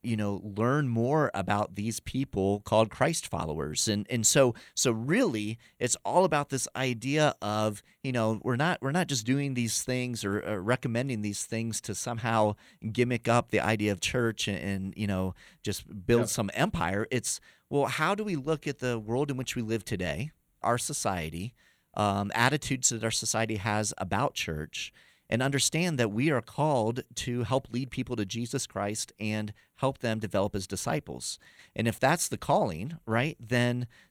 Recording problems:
none

